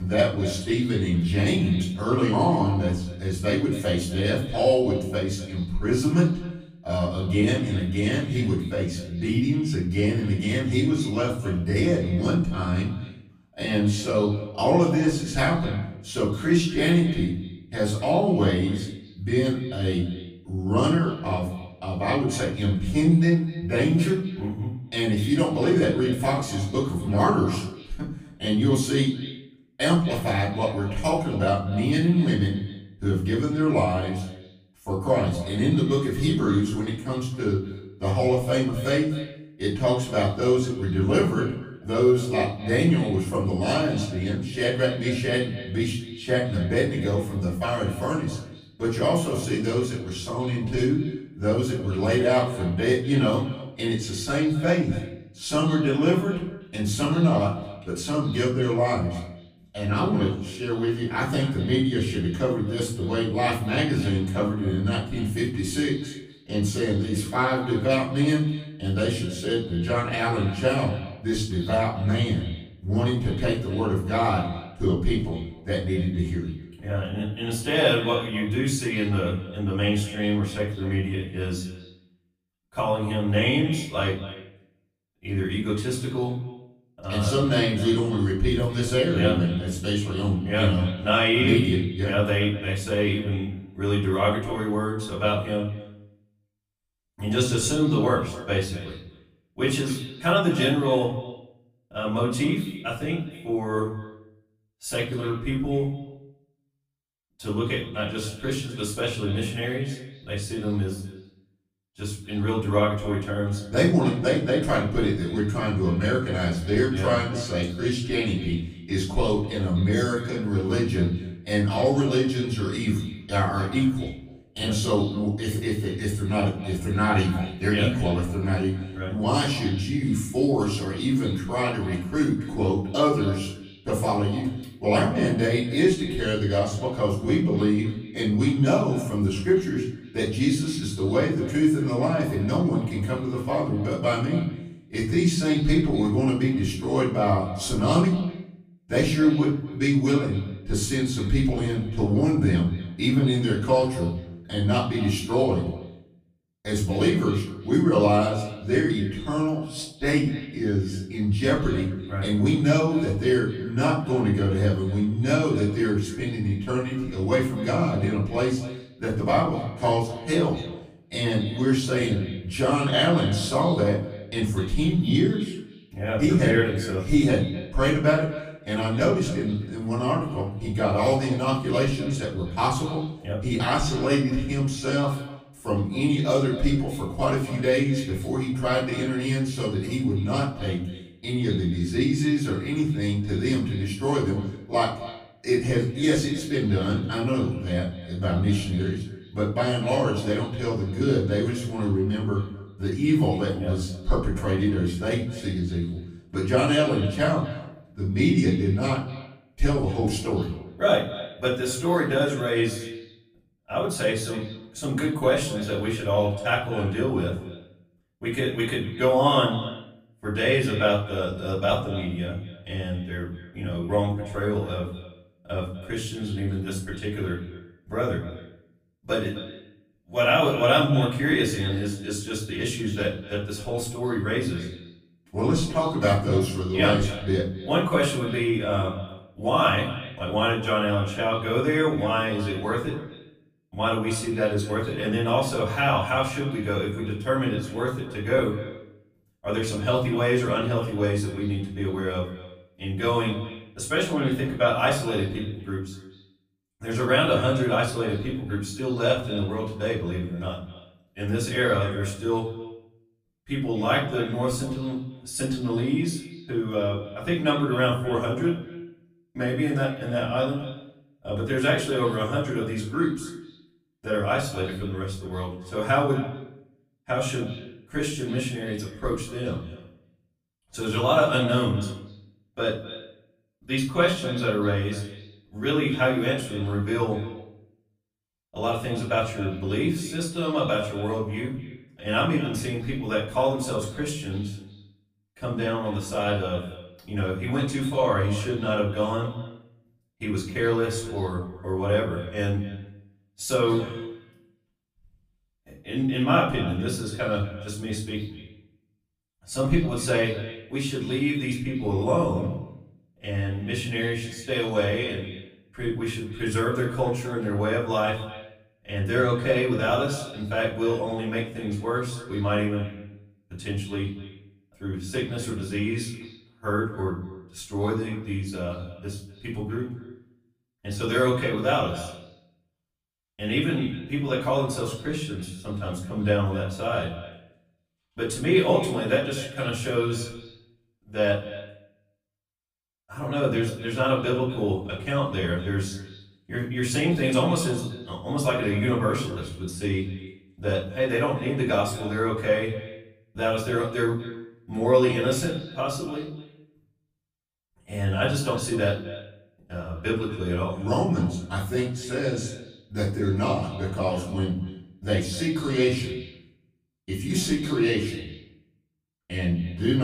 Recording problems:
off-mic speech; far
echo of what is said; noticeable; throughout; 250 ms later, 15 dB below the speech
room echo; slight; dies away in 0.5 s
abrupt cut into speech; at the start and the end

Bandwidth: 15 kHz